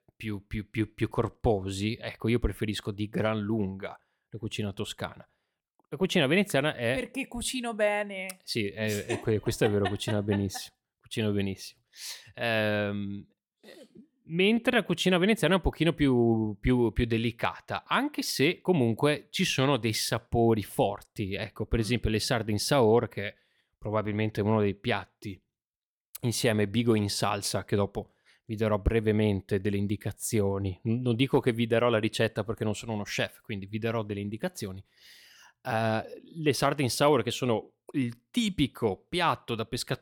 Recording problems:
none

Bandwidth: 18 kHz